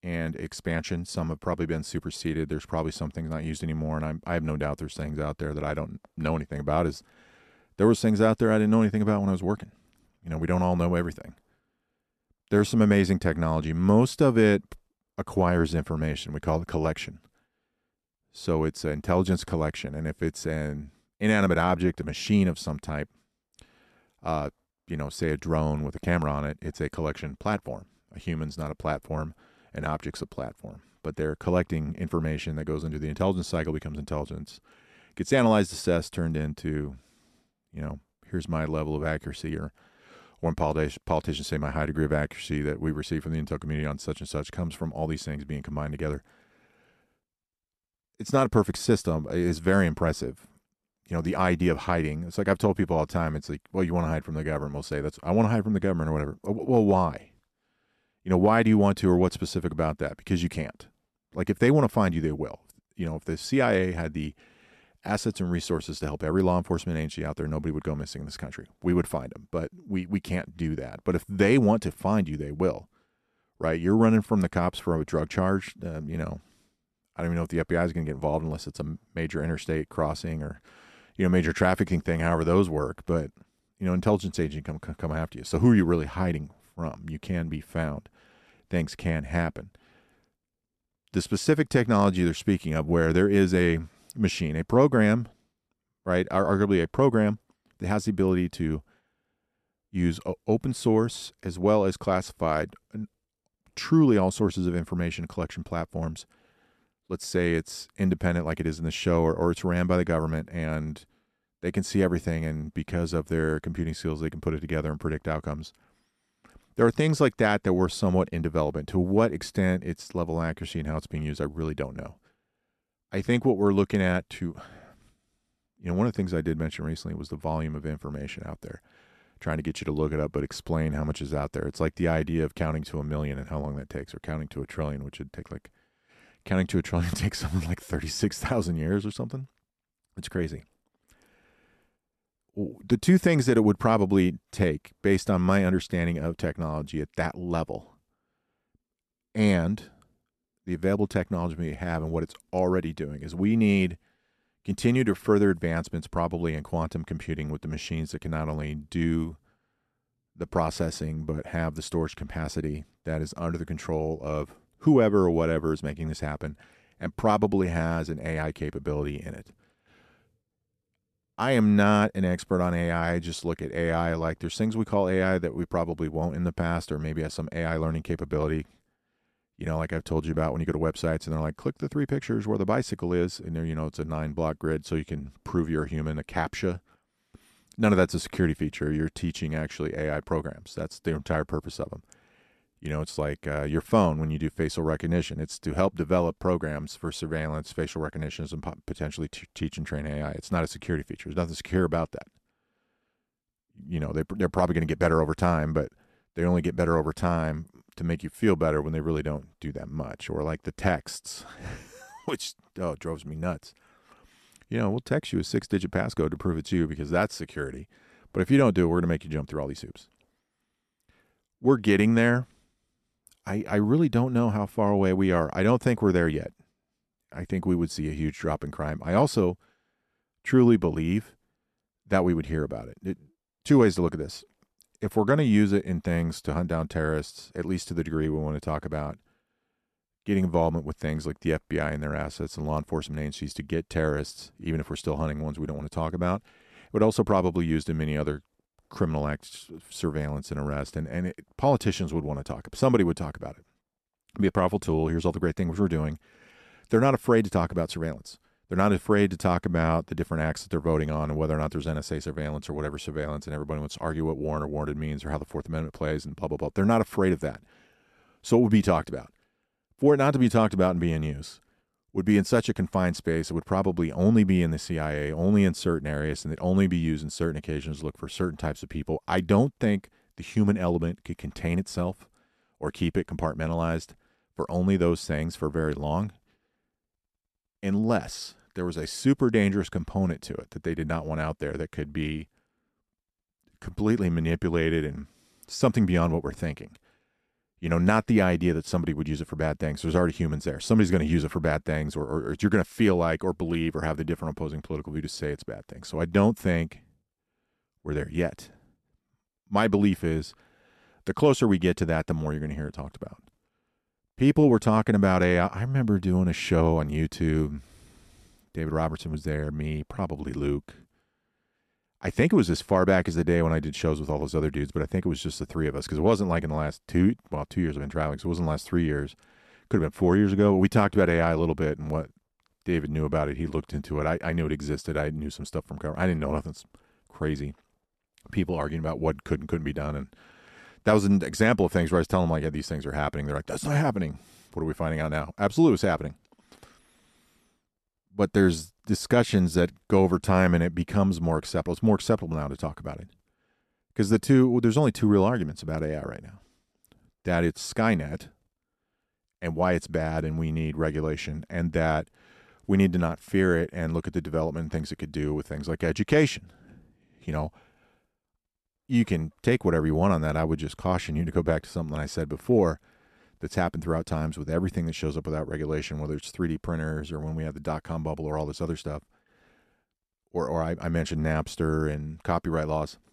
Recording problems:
none

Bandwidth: 13.5 kHz